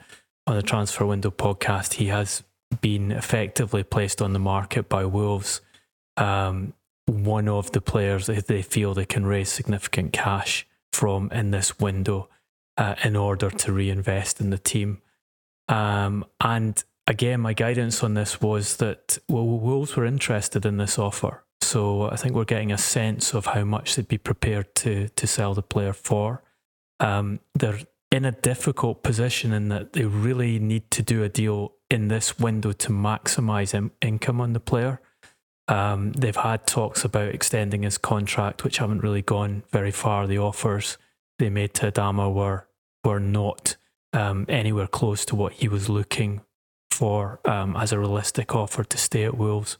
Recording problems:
squashed, flat; somewhat

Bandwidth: 18 kHz